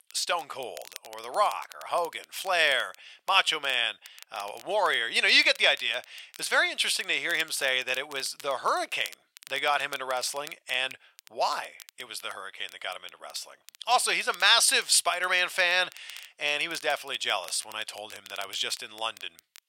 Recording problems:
thin; very; fading below 900 Hz
crackle, like an old record; faint; 25 dB below the speech

